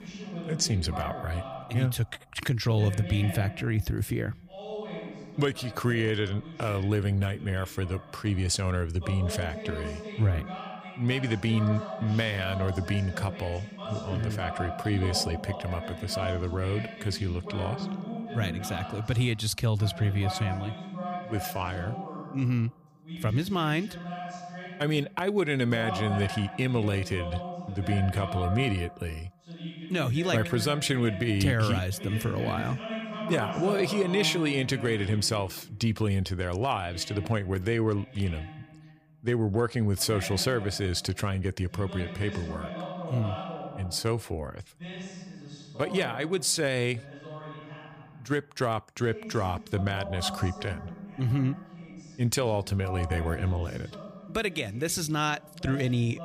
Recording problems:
voice in the background; loud; throughout; 10 dB below the speech

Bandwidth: 15 kHz